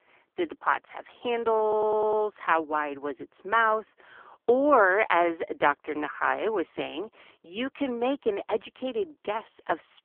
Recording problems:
phone-call audio; poor line
audio stuttering; at 1.5 s

